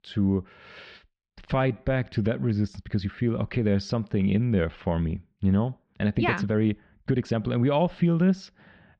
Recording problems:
muffled; slightly; fading above 4 kHz
uneven, jittery; strongly; from 1 to 7.5 s

